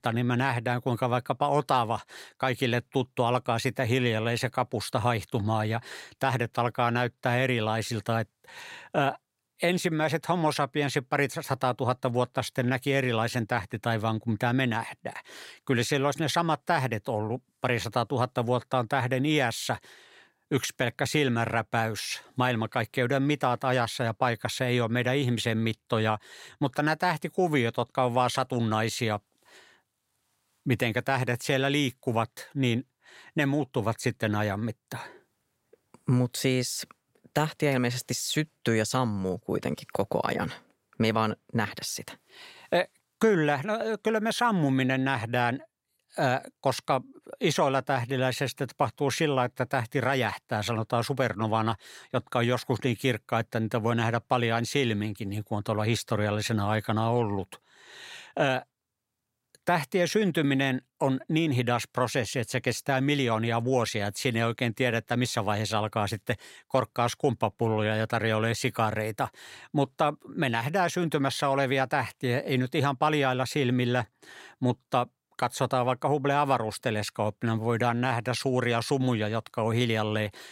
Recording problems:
none

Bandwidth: 16 kHz